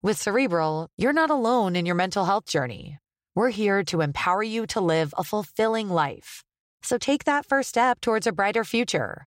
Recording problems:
none

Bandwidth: 16 kHz